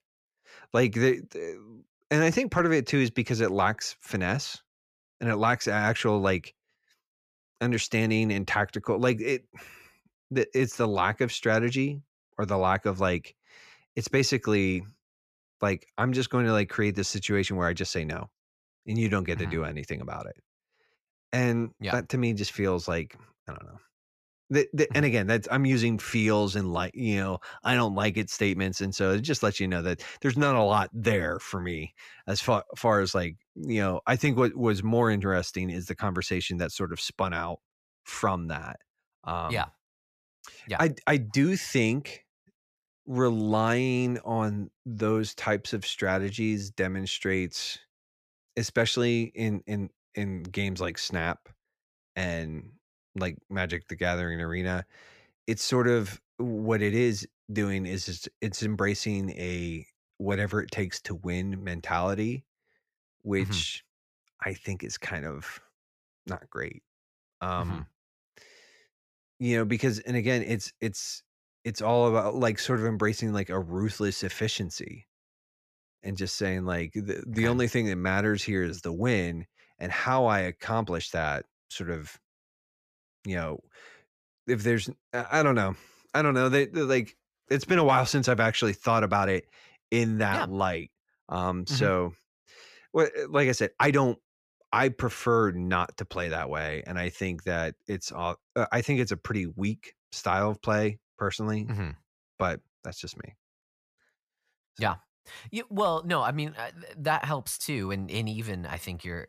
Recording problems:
none

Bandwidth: 14.5 kHz